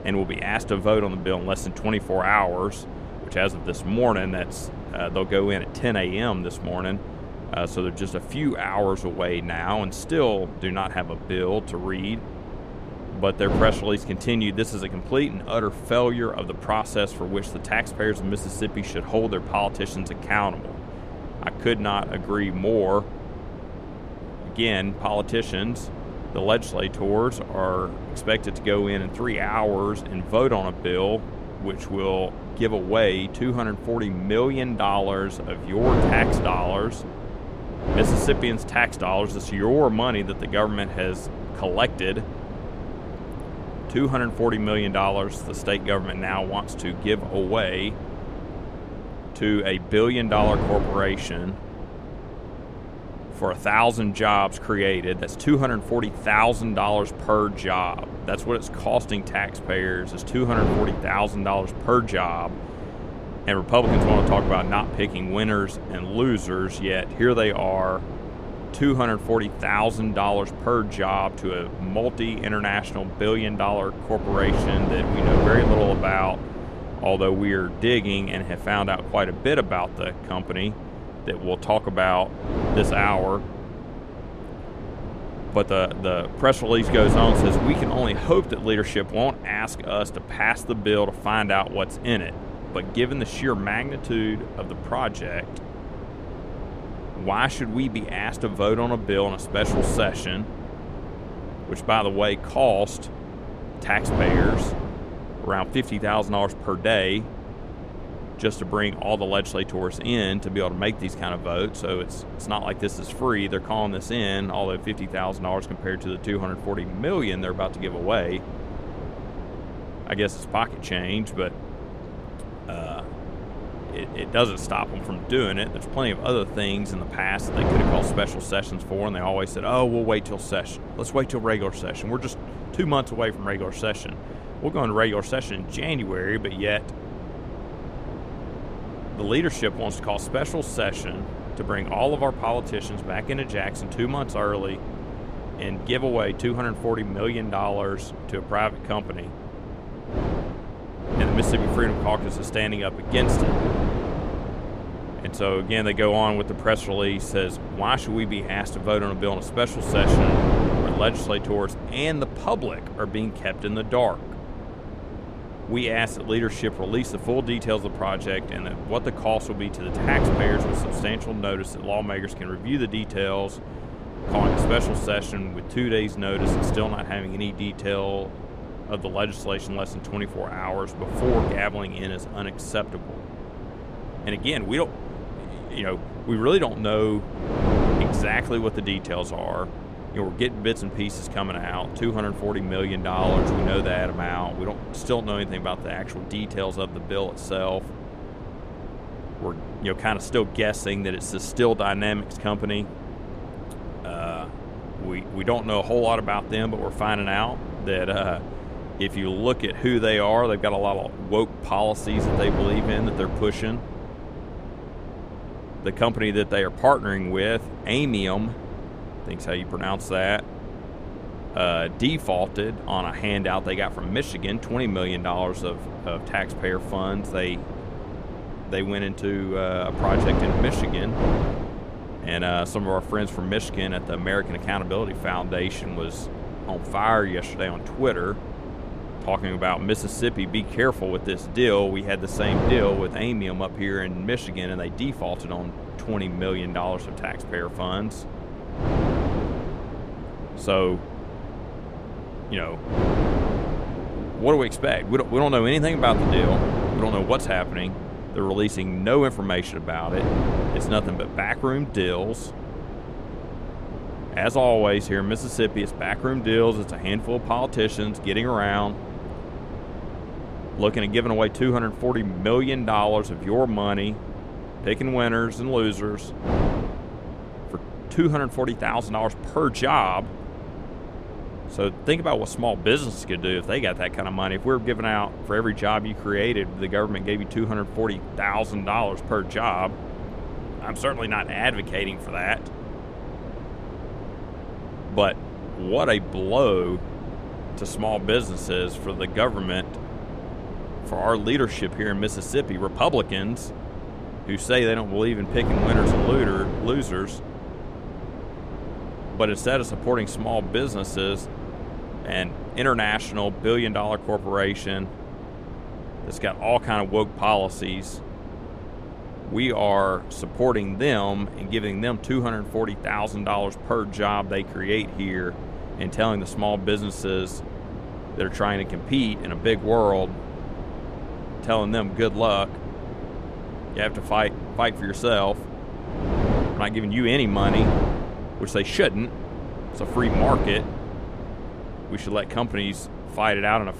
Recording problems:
wind noise on the microphone; occasional gusts; 10 dB below the speech

